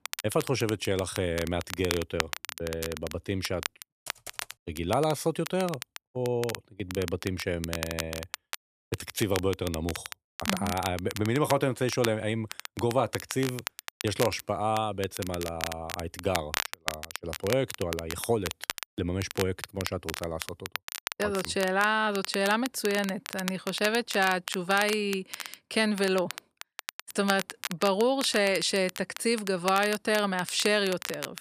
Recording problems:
crackle, like an old record; loud; 9 dB below the speech
keyboard typing; faint; at 4 s; peak 15 dB below the speech

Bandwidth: 14.5 kHz